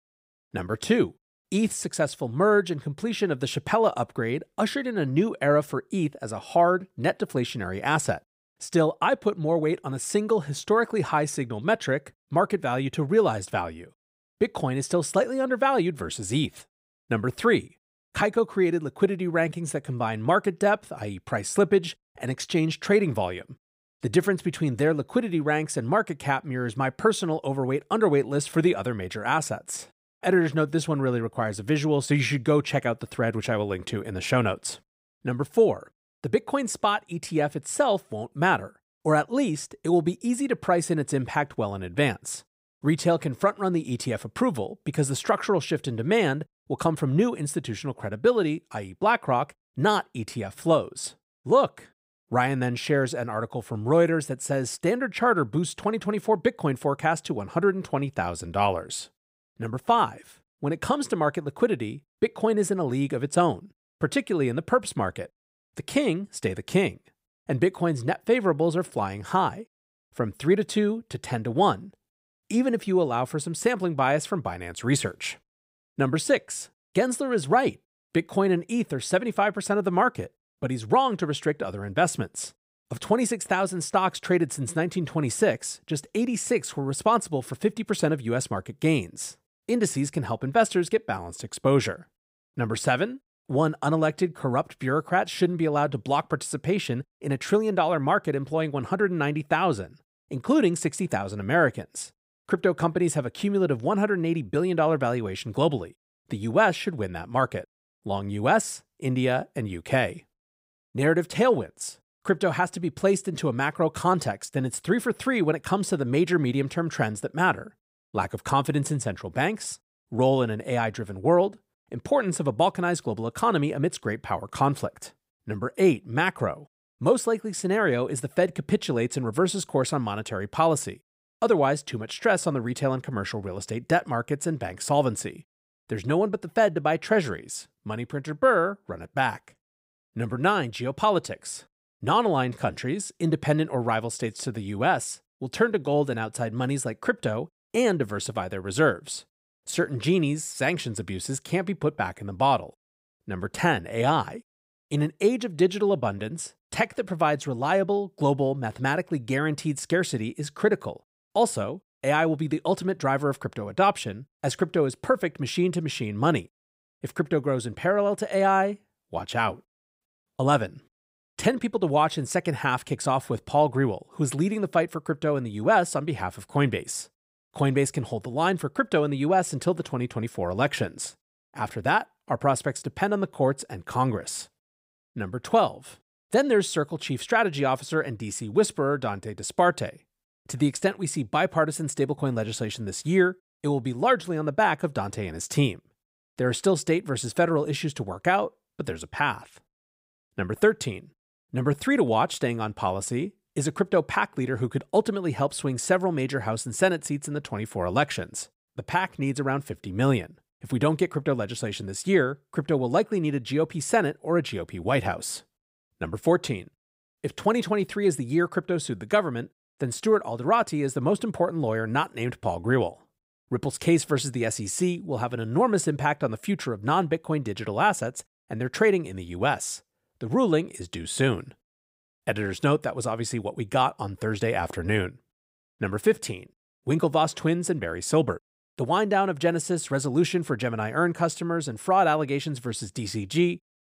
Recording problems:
none

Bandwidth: 15.5 kHz